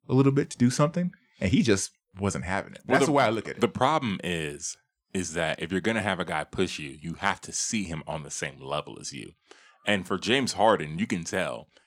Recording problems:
none

